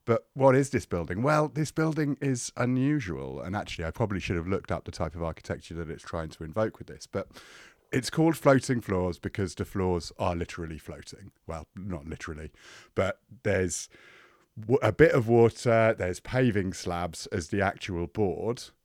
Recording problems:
none

